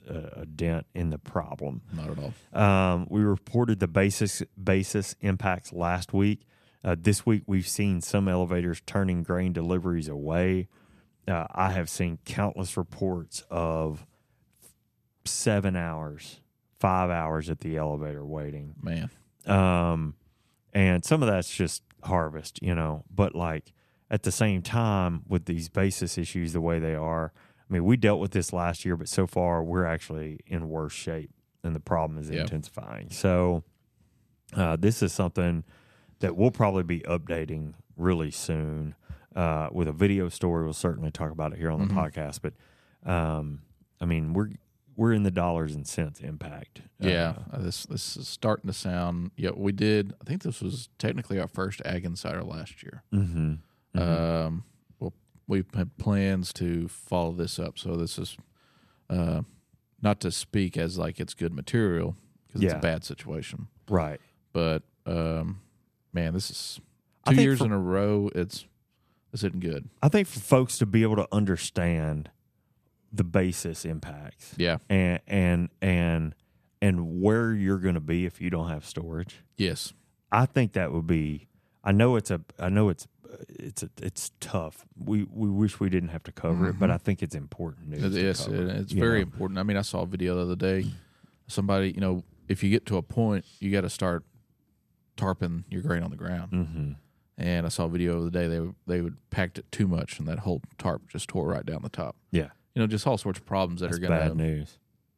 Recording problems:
none

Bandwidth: 14.5 kHz